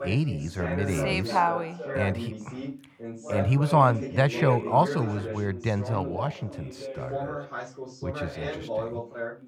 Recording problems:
background chatter; loud; throughout; 2 voices, 8 dB below the speech

